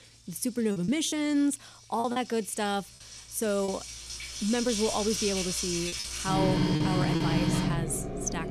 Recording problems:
household noises; very loud; throughout; 1 dB above the speech
choppy; very; from 0.5 to 3.5 s and from 6 to 7 s; 7% of the speech affected

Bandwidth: 14 kHz